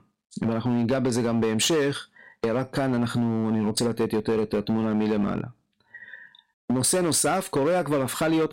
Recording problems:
distortion; slight; 11% of the sound clipped
squashed, flat; somewhat

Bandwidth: 16 kHz